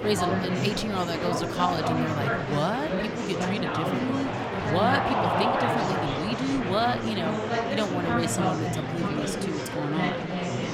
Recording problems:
murmuring crowd; very loud; throughout; 2 dB above the speech

